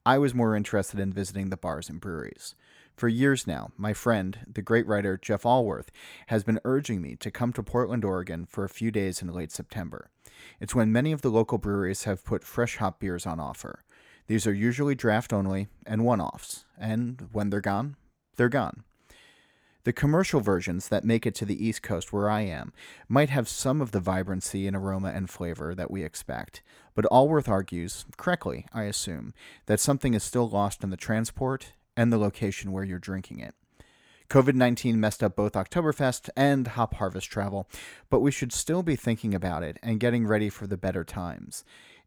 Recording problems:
none

